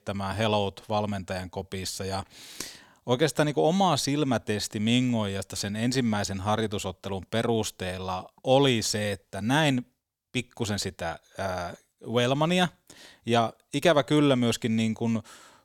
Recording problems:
none

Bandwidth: 18.5 kHz